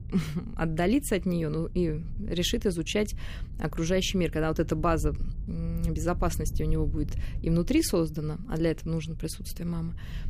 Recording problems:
low rumble; faint; throughout; 20 dB below the speech

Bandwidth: 15 kHz